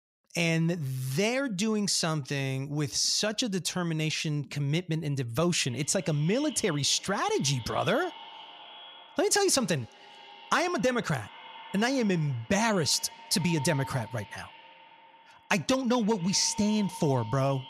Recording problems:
echo of what is said; noticeable; from 5.5 s on; 230 ms later, 20 dB below the speech

